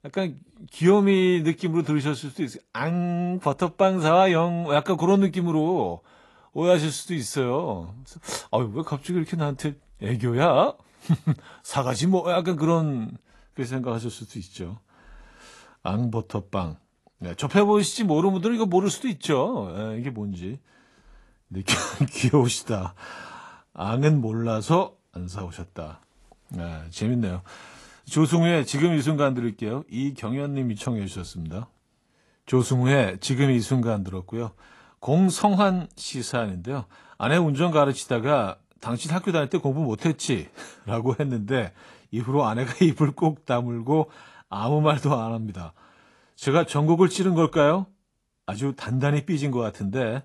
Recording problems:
garbled, watery; slightly; nothing above 11.5 kHz

